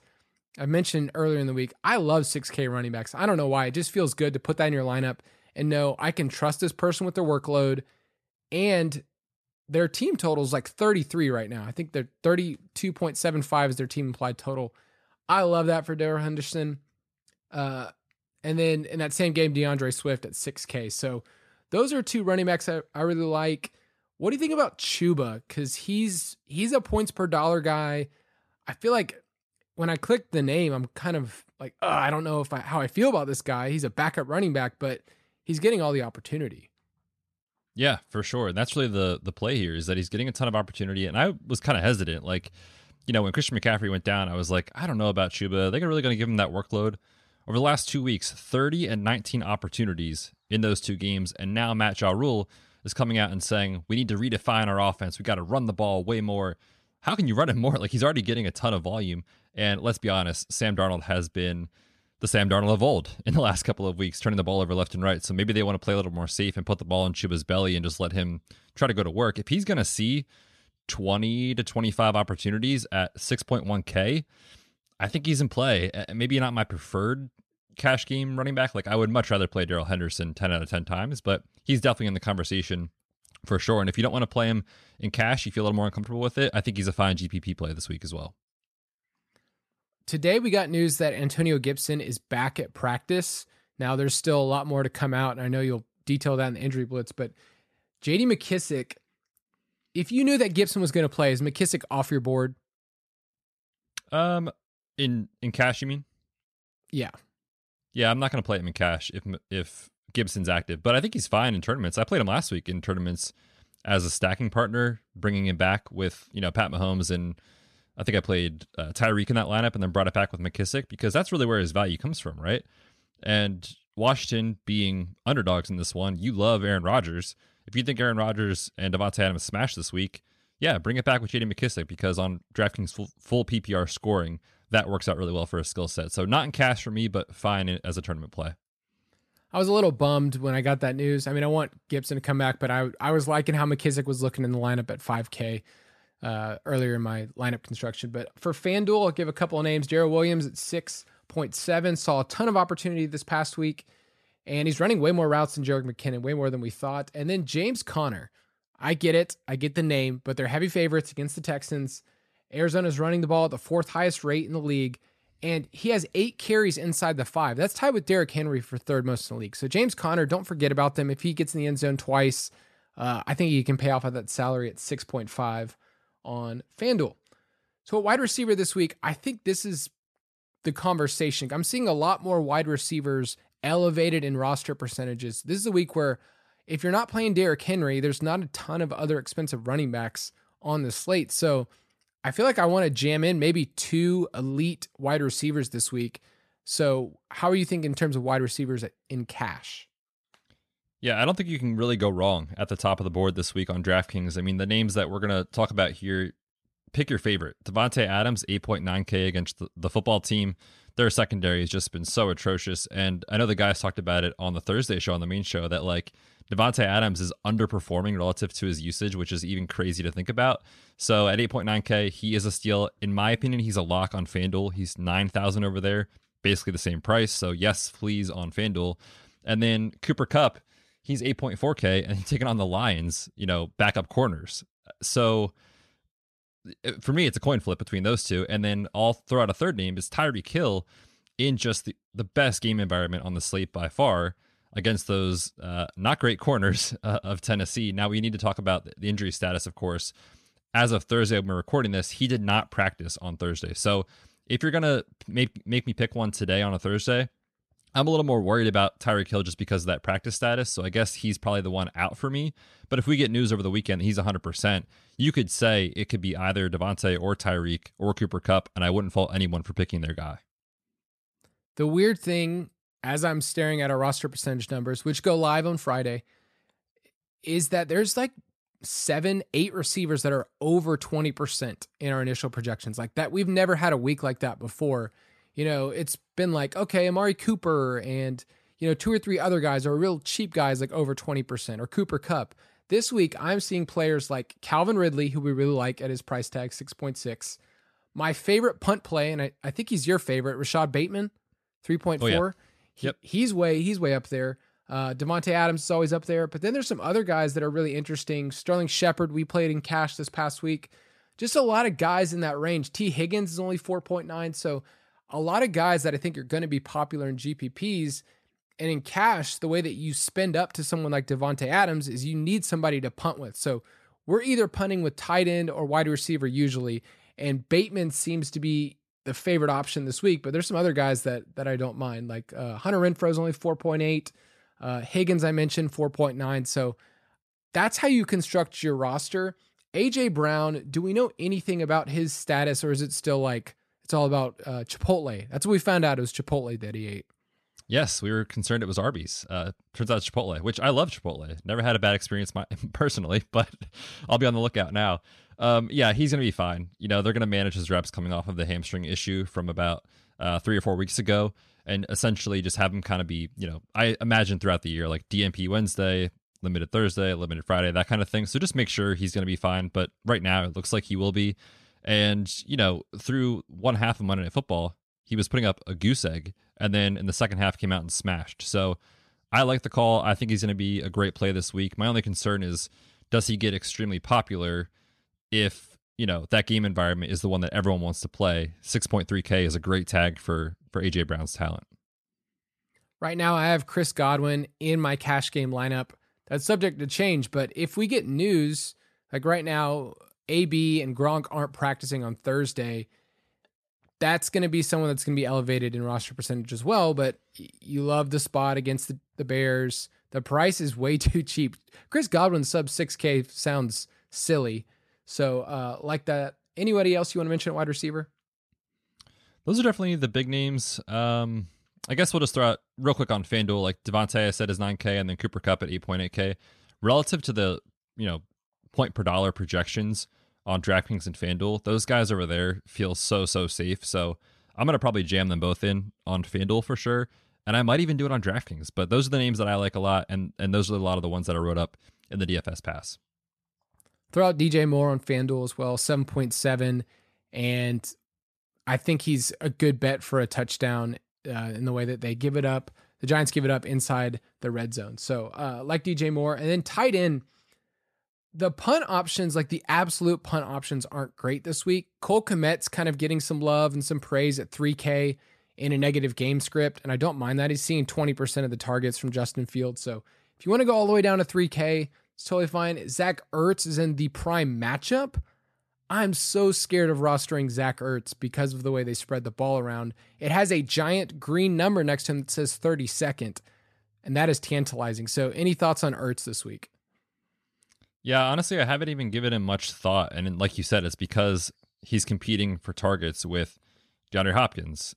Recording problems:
none

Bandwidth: 13.5 kHz